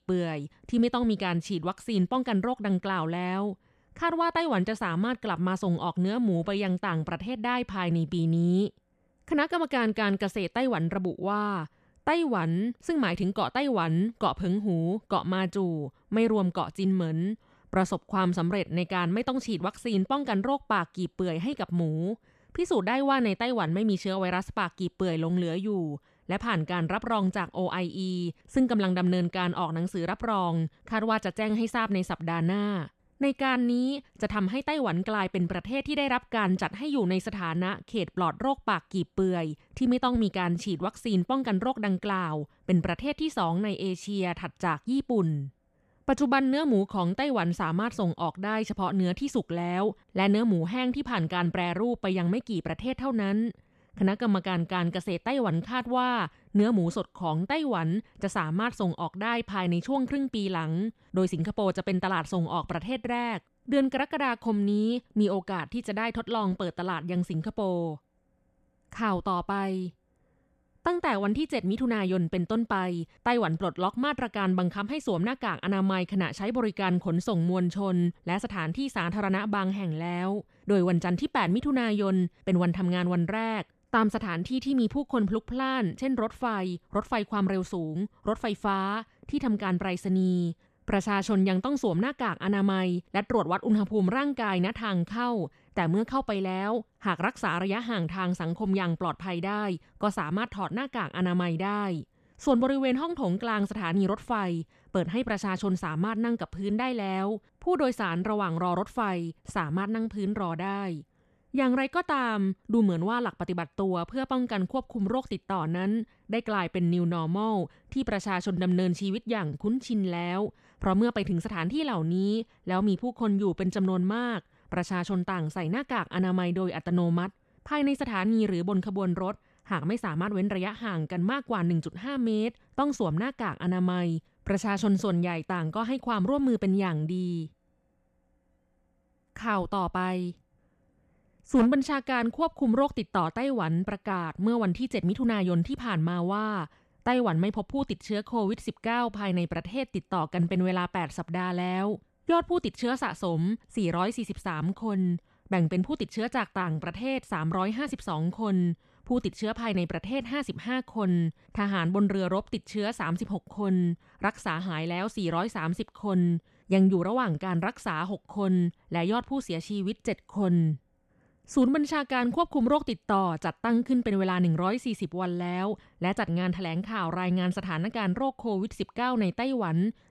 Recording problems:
none

